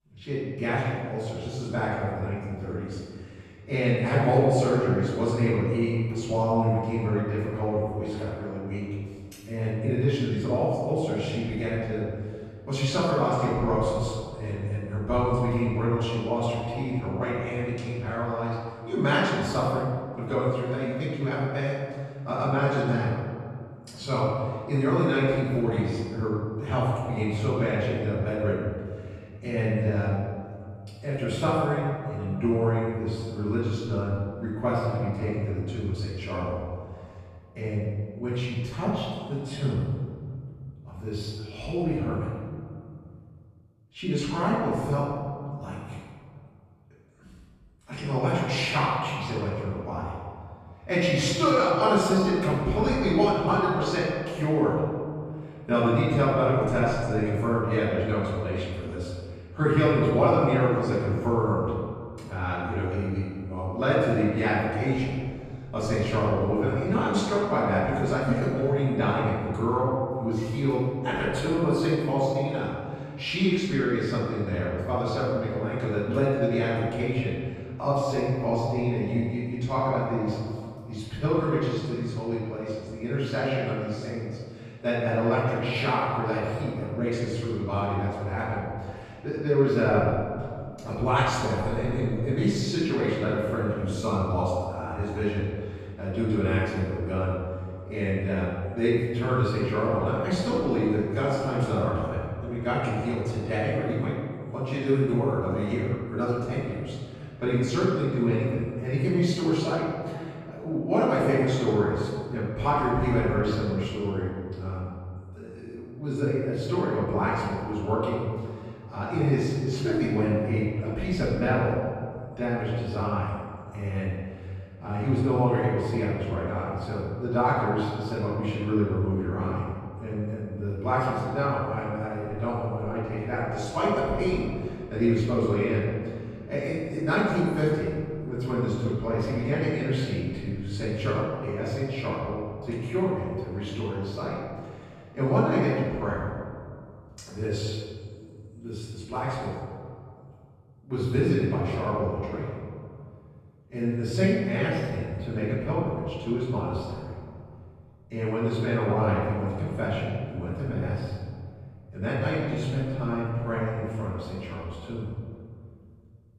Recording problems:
room echo; strong; dies away in 1.9 s
off-mic speech; far

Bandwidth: 13.5 kHz